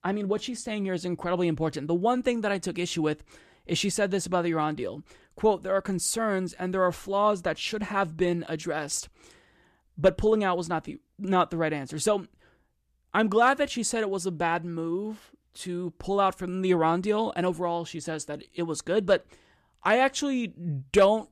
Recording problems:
none

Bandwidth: 14.5 kHz